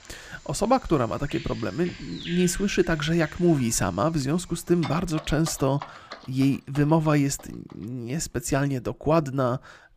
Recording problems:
animal sounds; noticeable; throughout; 20 dB below the speech

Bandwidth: 15 kHz